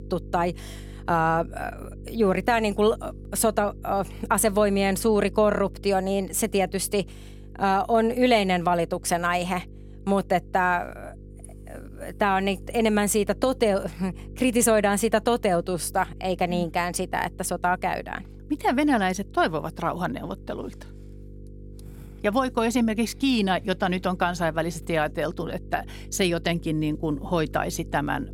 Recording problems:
electrical hum; faint; throughout; 50 Hz, 25 dB below the speech

